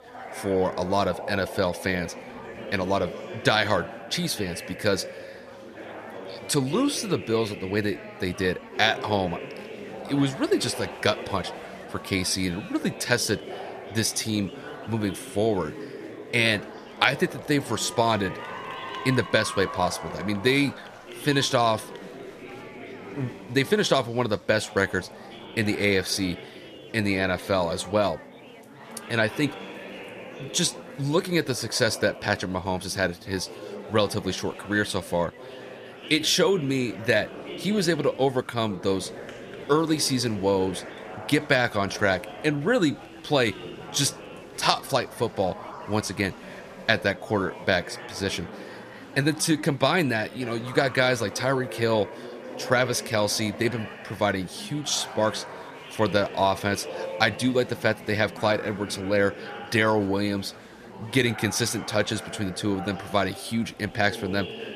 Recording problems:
chatter from many people; noticeable; throughout; 15 dB below the speech

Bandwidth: 14.5 kHz